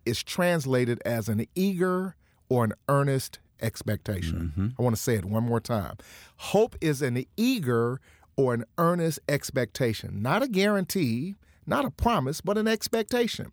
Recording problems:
none

